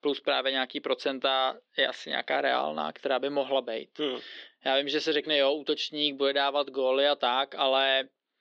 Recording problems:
thin; somewhat; fading below 300 Hz
muffled; very slightly; fading above 3.5 kHz

